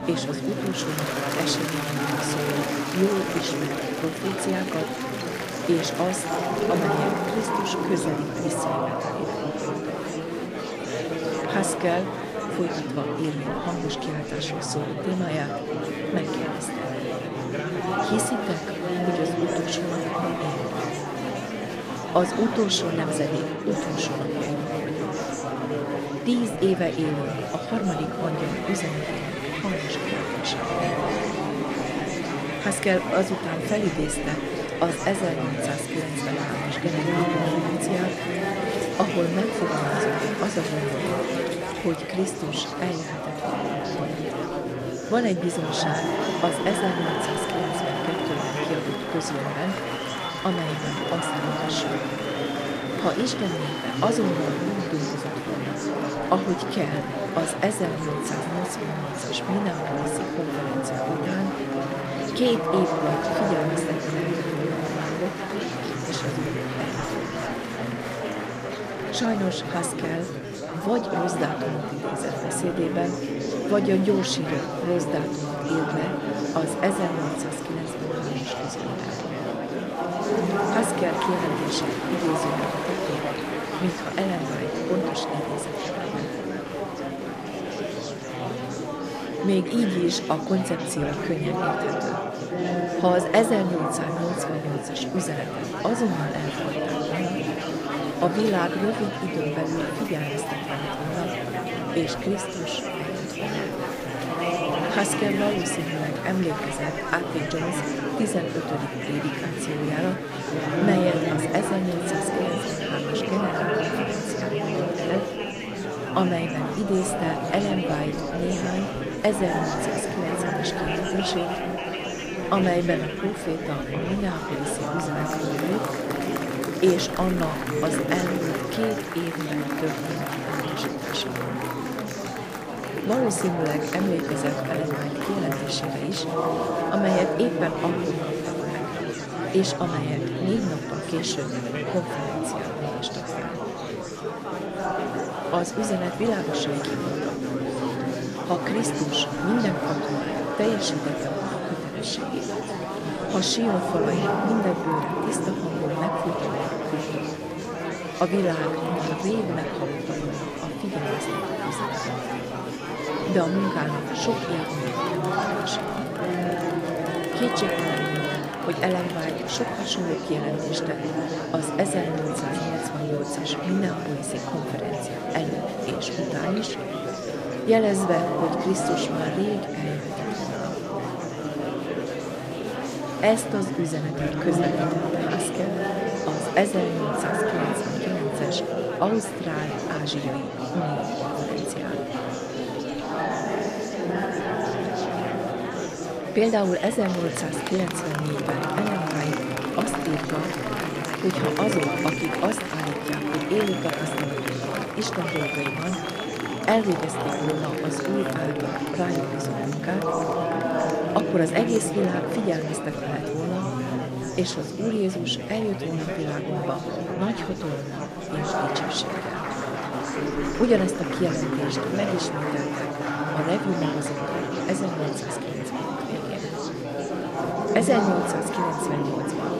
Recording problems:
chatter from many people; very loud; throughout; 1 dB above the speech

